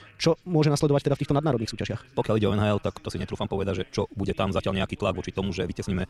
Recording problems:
wrong speed, natural pitch; too fast; 1.7 times normal speed
voice in the background; faint; throughout; 25 dB below the speech

